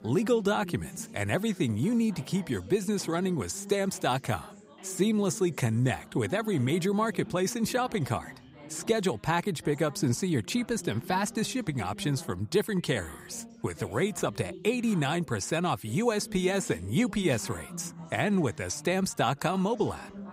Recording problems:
background chatter; noticeable; throughout; 4 voices, 15 dB below the speech

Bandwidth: 15.5 kHz